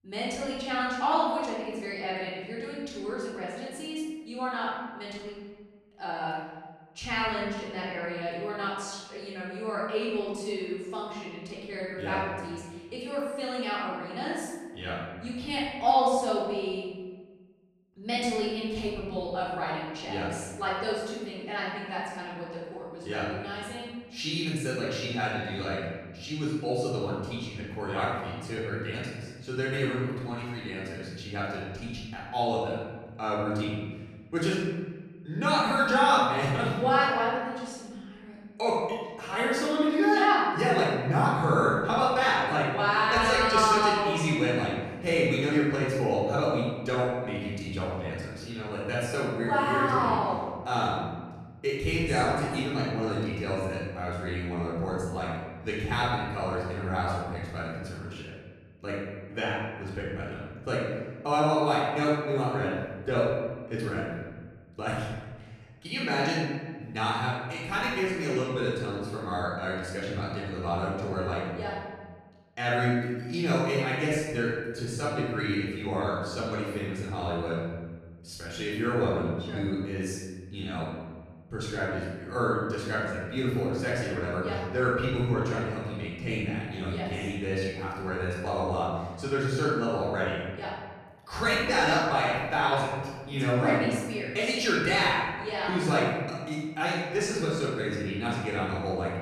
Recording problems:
room echo; strong; dies away in 1.4 s
off-mic speech; far

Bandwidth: 14.5 kHz